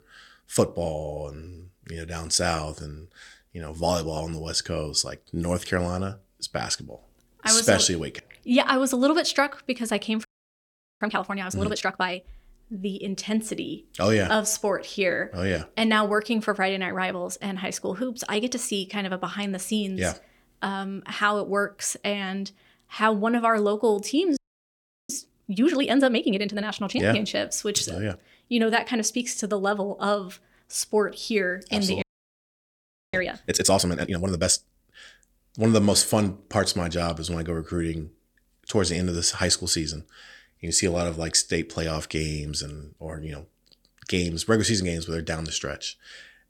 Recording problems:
audio freezing; at 10 s for 1 s, at 24 s for 0.5 s and at 32 s for 1 s

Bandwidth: 18 kHz